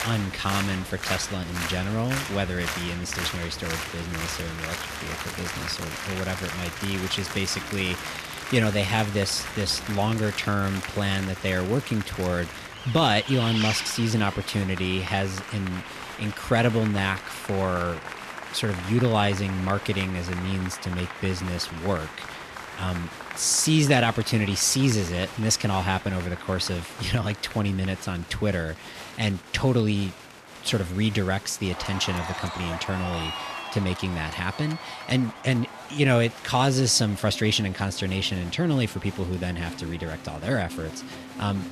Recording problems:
crowd noise; loud; throughout; 10 dB below the speech
traffic noise; noticeable; until 26 s; 15 dB below the speech
murmuring crowd; faint; throughout; 25 dB below the speech

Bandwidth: 14 kHz